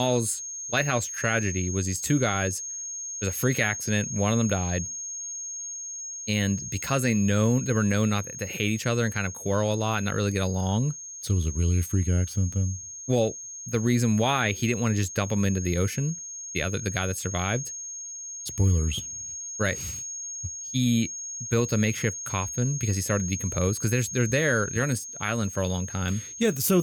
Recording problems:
high-pitched whine; loud; throughout; 6.5 kHz, 7 dB below the speech
abrupt cut into speech; at the start and the end

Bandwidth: 18 kHz